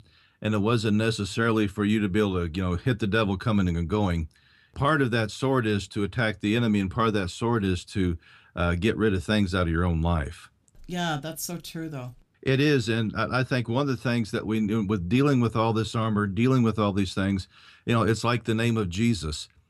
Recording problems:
none

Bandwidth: 14.5 kHz